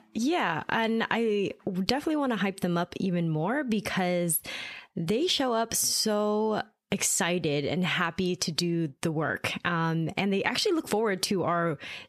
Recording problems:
squashed, flat; heavily

